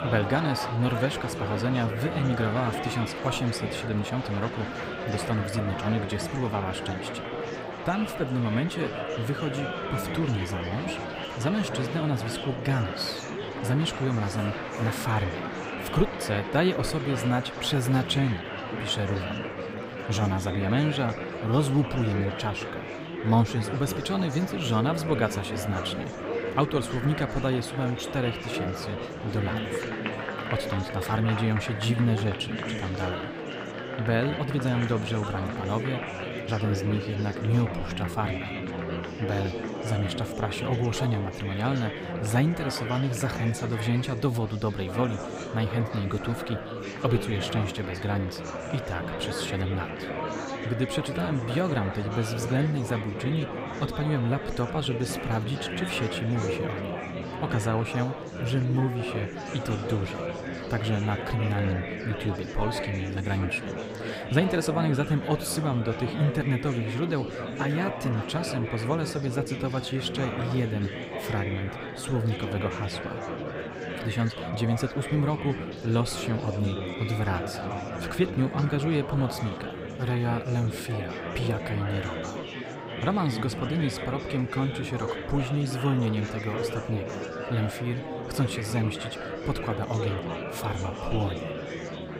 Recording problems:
murmuring crowd; loud; throughout; 5 dB below the speech

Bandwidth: 15.5 kHz